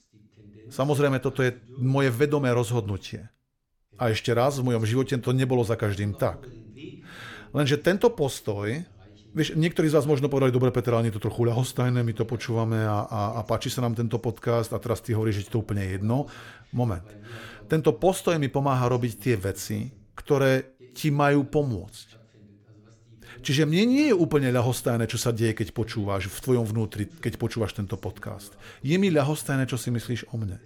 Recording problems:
voice in the background; faint; throughout; 25 dB below the speech

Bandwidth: 18 kHz